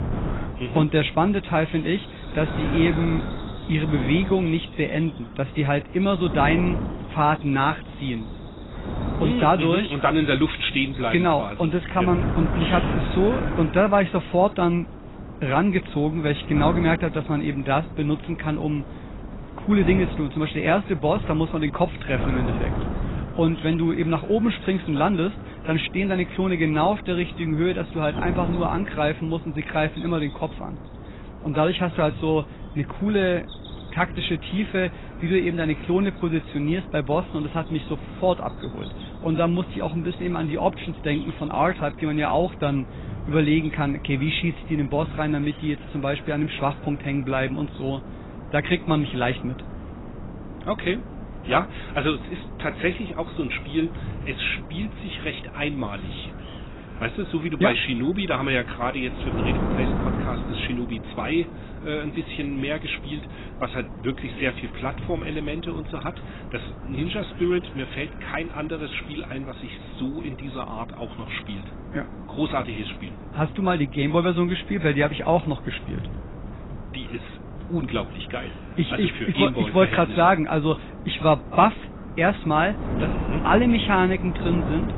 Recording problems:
garbled, watery; badly; nothing above 4 kHz
wind noise on the microphone; occasional gusts; 15 dB below the speech
animal sounds; faint; throughout; 30 dB below the speech

